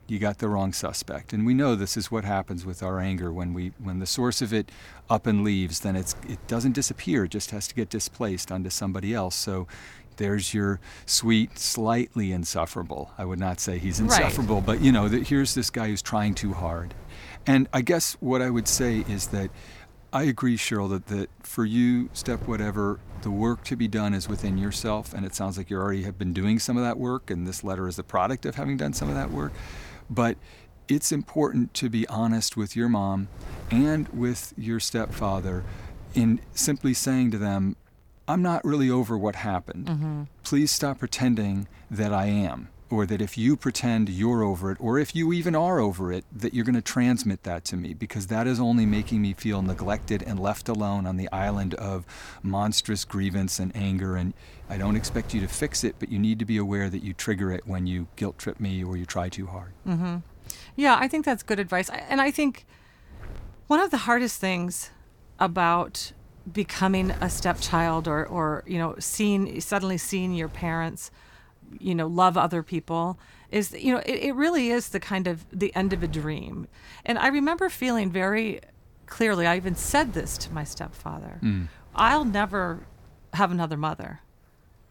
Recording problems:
wind noise on the microphone; occasional gusts; 25 dB below the speech

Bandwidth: 18.5 kHz